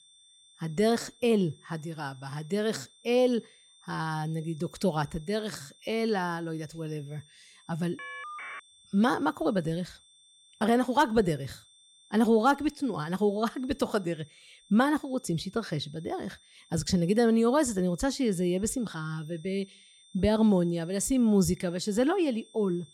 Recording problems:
high-pitched whine; faint; throughout; 3.5 kHz, 30 dB below the speech
phone ringing; faint; at 8 s; peak 10 dB below the speech

